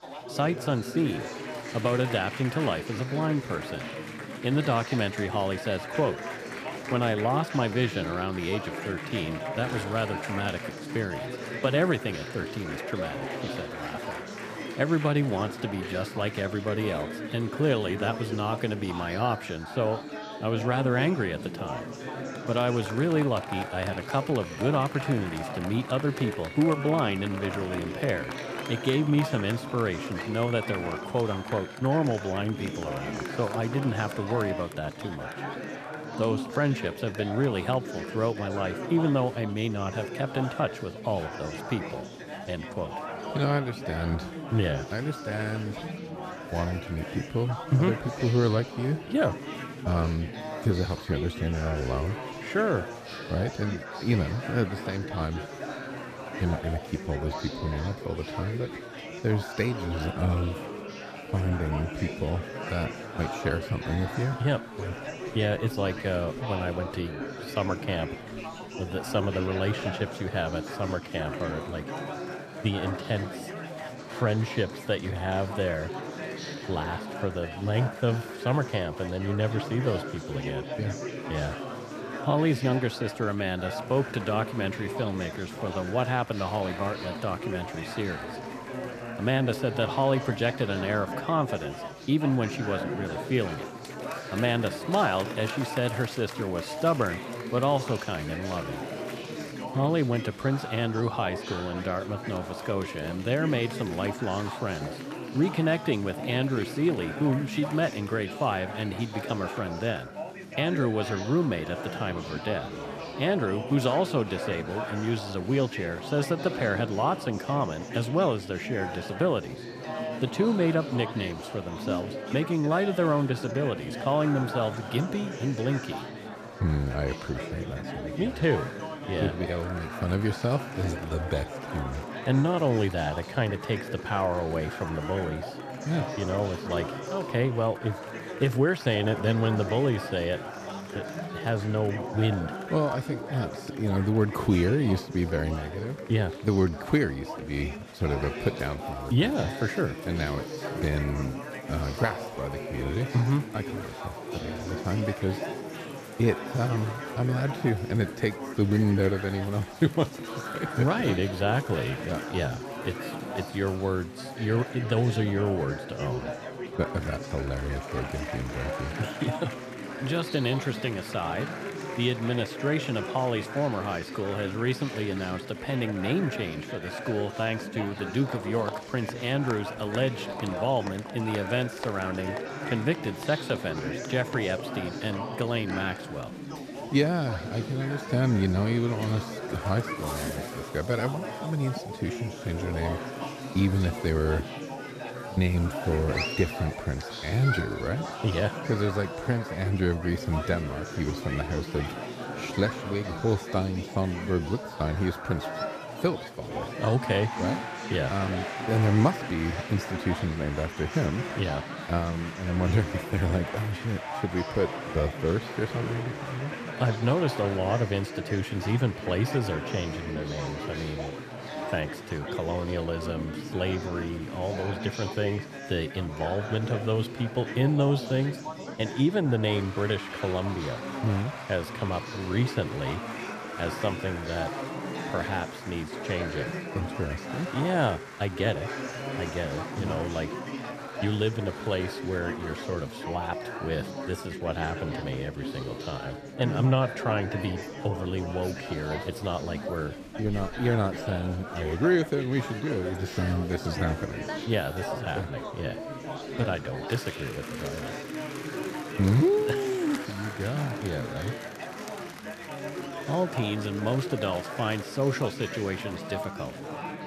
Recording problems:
chatter from many people; loud; throughout; 7 dB below the speech

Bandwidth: 14.5 kHz